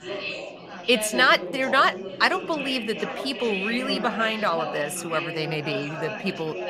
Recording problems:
chatter from many people; loud; throughout; 8 dB below the speech

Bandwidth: 15 kHz